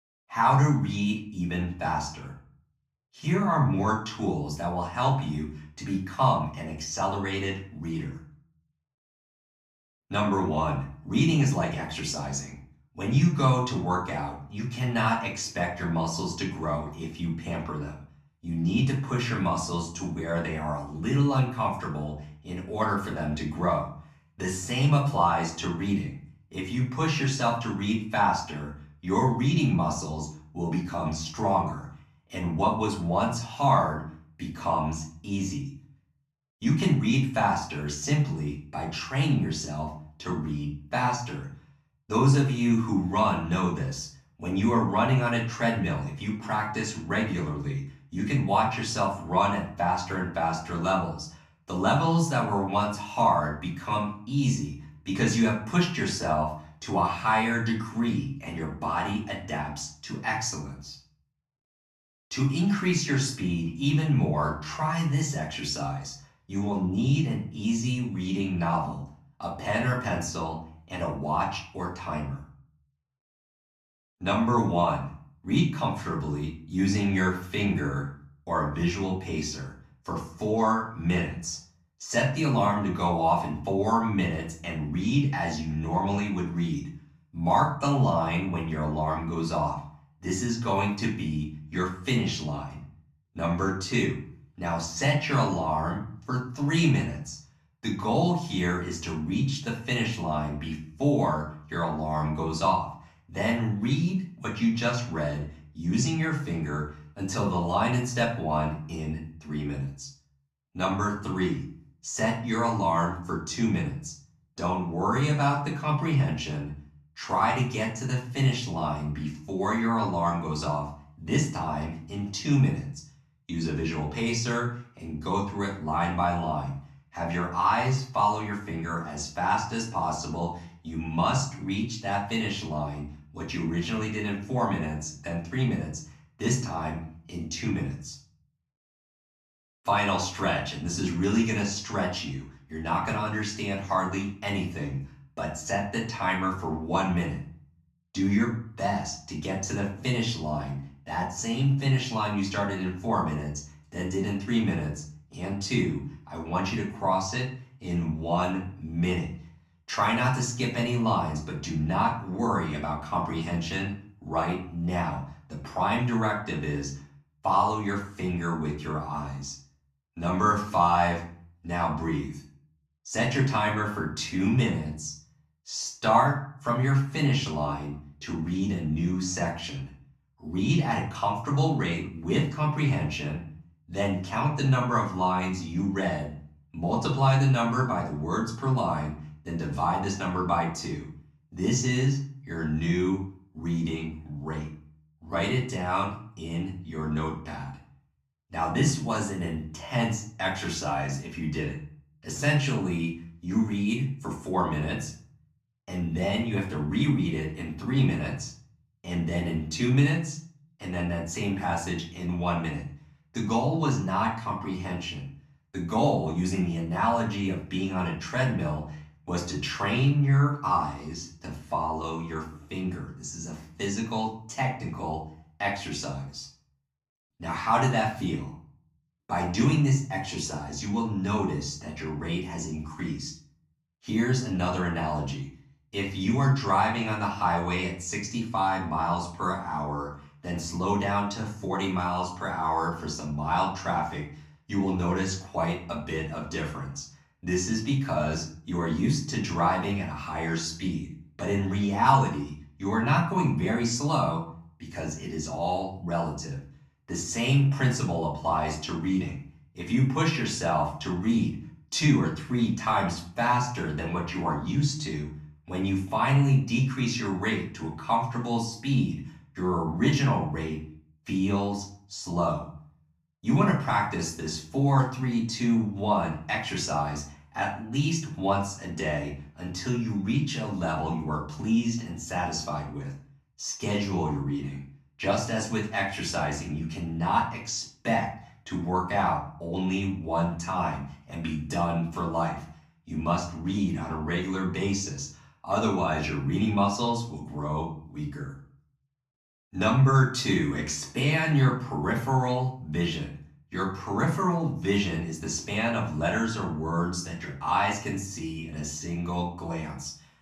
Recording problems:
off-mic speech; far
room echo; slight; dies away in 0.4 s

